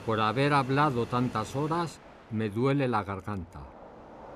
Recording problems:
train or aircraft noise; noticeable; throughout; 20 dB below the speech

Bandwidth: 14.5 kHz